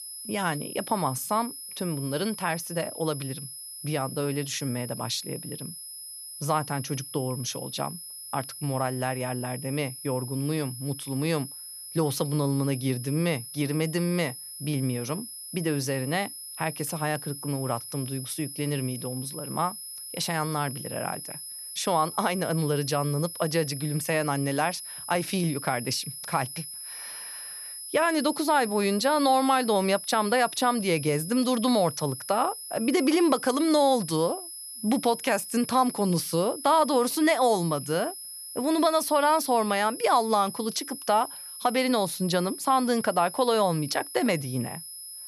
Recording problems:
high-pitched whine; noticeable; throughout; 10 kHz, 10 dB below the speech

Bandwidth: 14 kHz